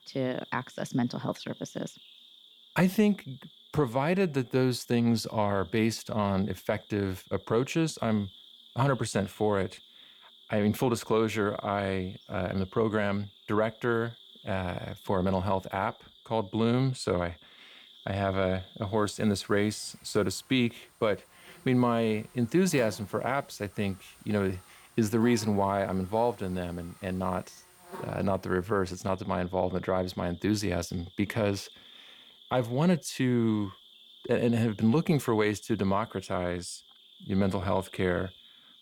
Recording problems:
animal sounds; faint; throughout; 25 dB below the speech

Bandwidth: 18.5 kHz